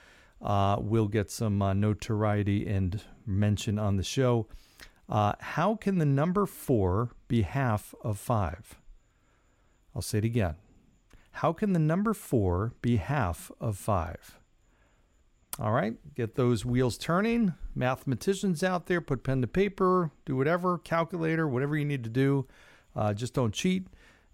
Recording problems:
none

